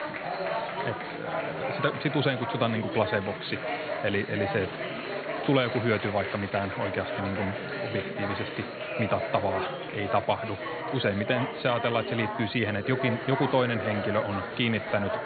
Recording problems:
high frequencies cut off; severe; nothing above 4.5 kHz
chatter from many people; loud; throughout; 4 dB below the speech

